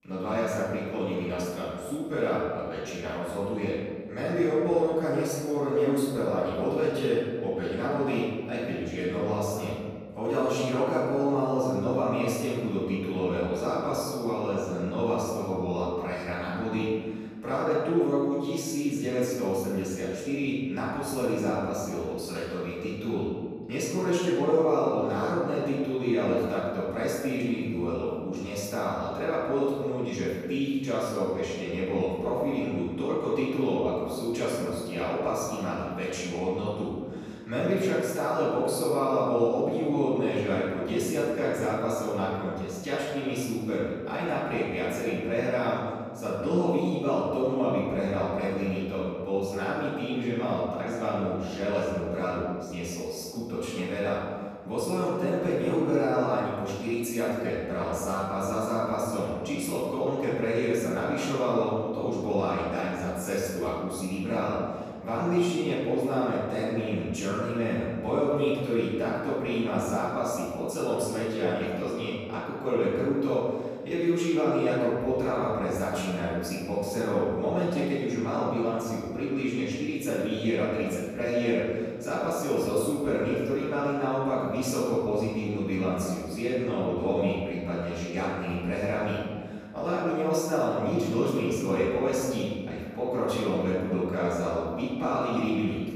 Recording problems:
room echo; strong; dies away in 1.5 s
off-mic speech; far

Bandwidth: 14 kHz